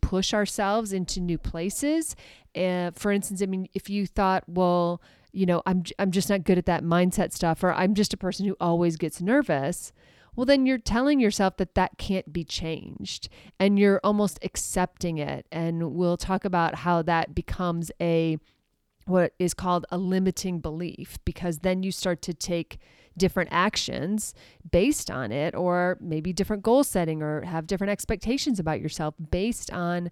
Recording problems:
none

